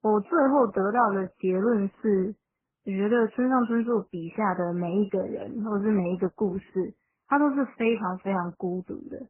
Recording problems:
garbled, watery; badly; nothing above 3 kHz

